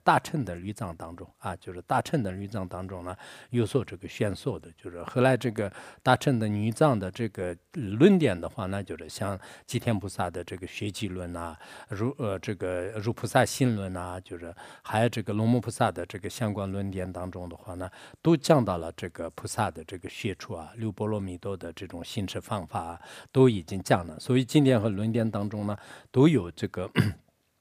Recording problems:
none

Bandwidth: 15 kHz